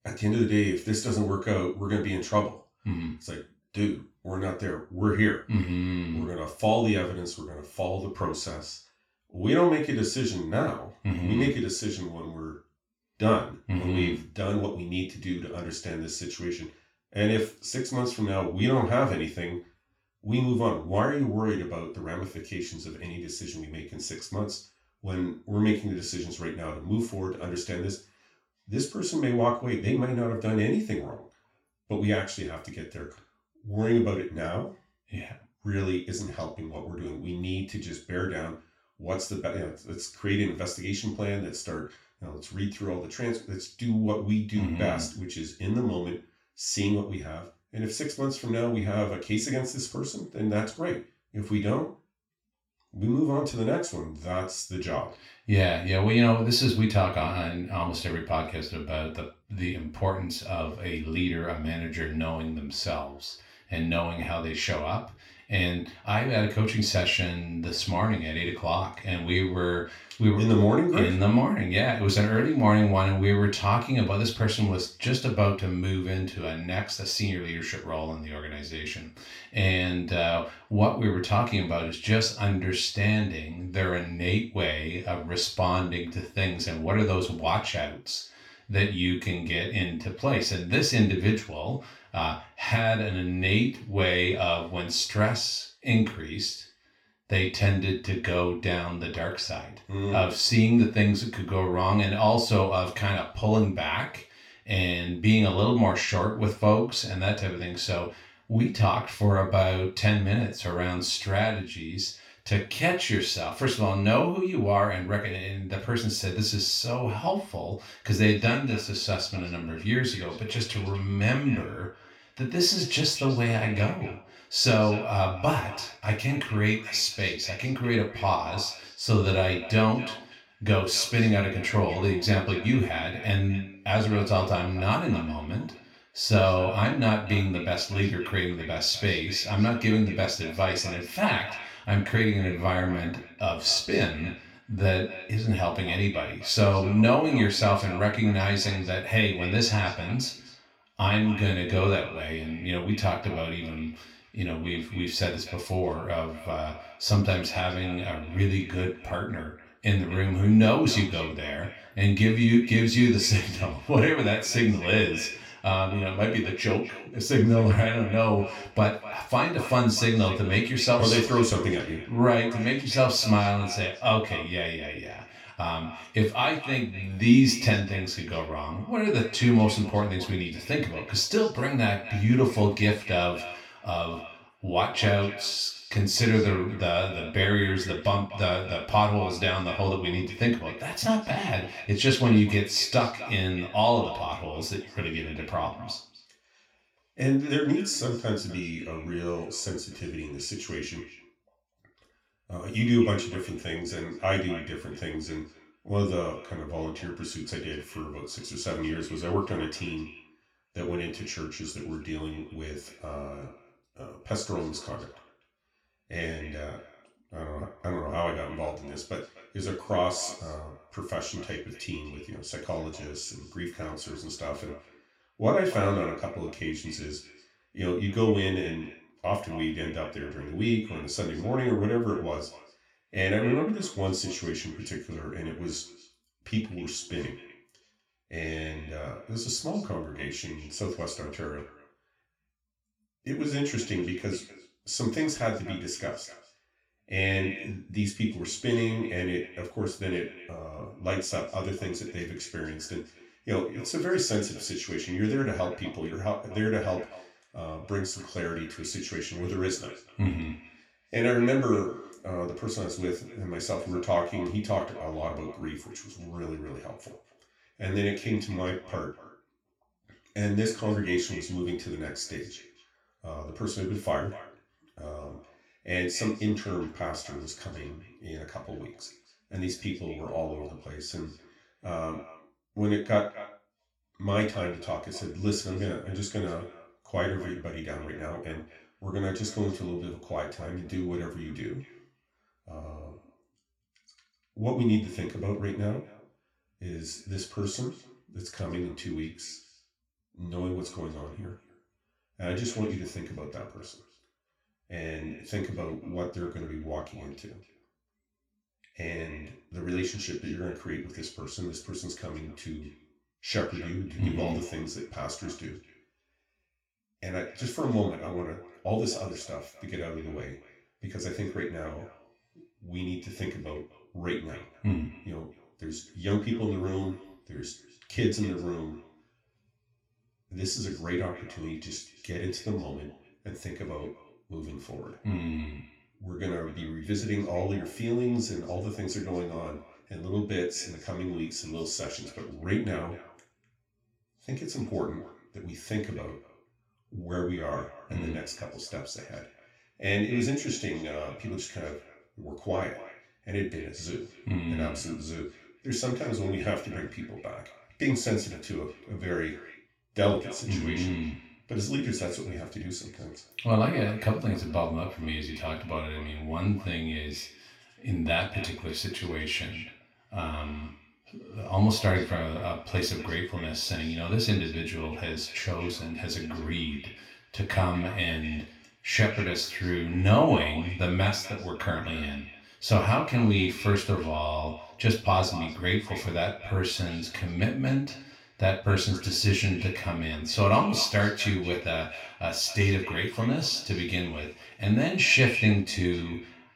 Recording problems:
off-mic speech; far
echo of what is said; noticeable; from 1:58 on; 250 ms later, 15 dB below the speech
room echo; slight; dies away in 0.3 s

